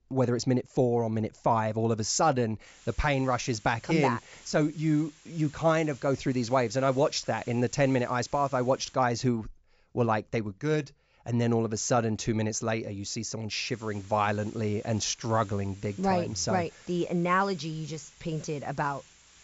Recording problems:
high frequencies cut off; noticeable; nothing above 8 kHz
hiss; faint; from 2.5 to 9 s and from 14 s on; 25 dB below the speech

